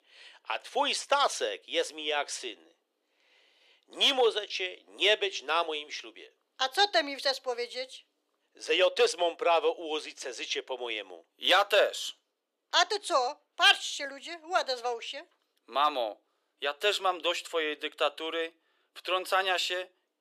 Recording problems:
thin; very; fading below 400 Hz

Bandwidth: 14.5 kHz